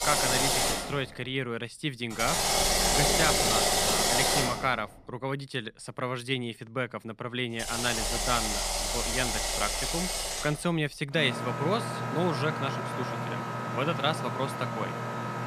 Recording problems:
machinery noise; very loud; throughout; 4 dB above the speech

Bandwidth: 14.5 kHz